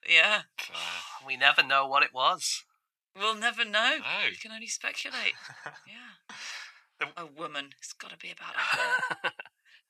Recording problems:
thin; very; fading below 800 Hz

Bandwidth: 14 kHz